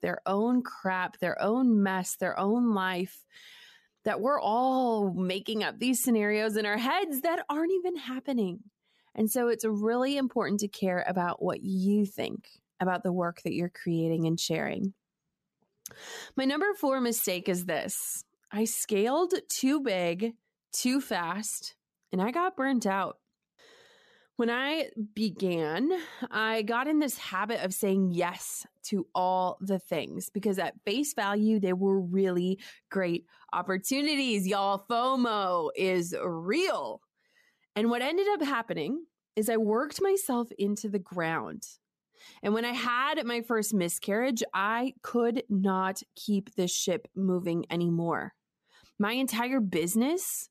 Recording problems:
none

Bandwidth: 14.5 kHz